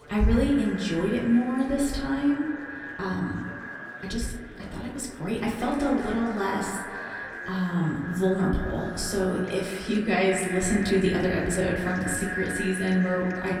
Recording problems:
echo of what is said; strong; throughout; 190 ms later, 8 dB below the speech
off-mic speech; far
room echo; slight; dies away in 0.5 s
murmuring crowd; noticeable; throughout; 20 dB below the speech
uneven, jittery; strongly; from 1 to 12 s

